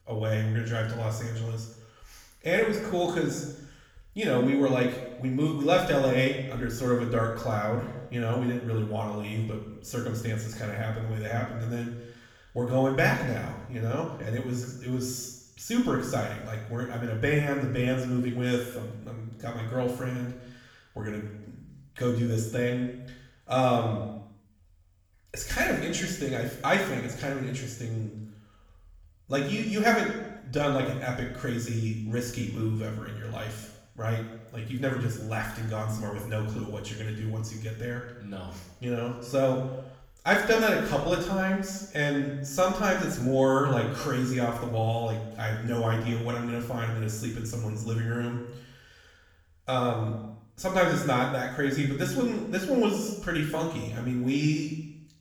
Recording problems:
off-mic speech; far
room echo; noticeable; dies away in 0.8 s

